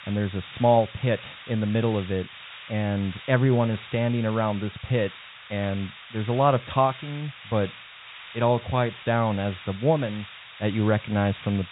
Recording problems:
high frequencies cut off; severe; nothing above 4 kHz
hiss; noticeable; throughout; 15 dB below the speech

